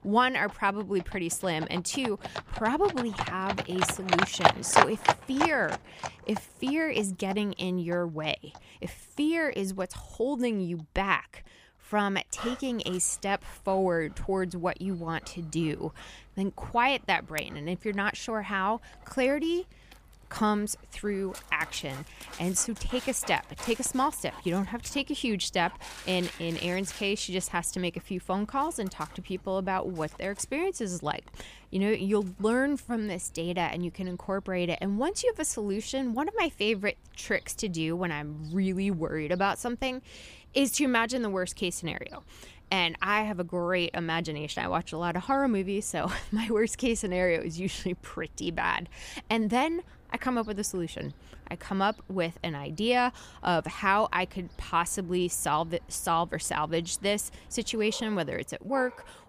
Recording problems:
animal sounds; loud; throughout; 4 dB below the speech

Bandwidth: 15 kHz